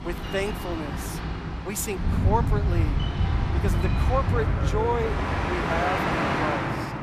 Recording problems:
train or aircraft noise; very loud; throughout; 4 dB above the speech
electrical hum; noticeable; until 1.5 s and from 3 to 5.5 s; 50 Hz, 20 dB below the speech

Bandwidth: 14.5 kHz